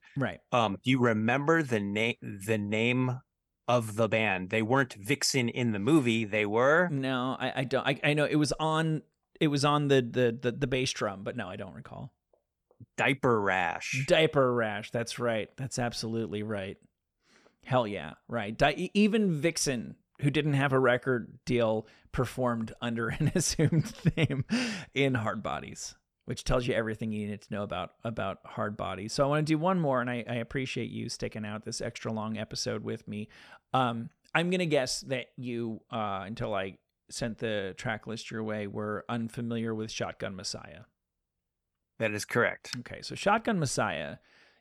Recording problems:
none

